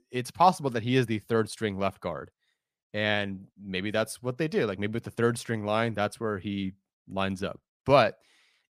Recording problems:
none

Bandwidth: 15 kHz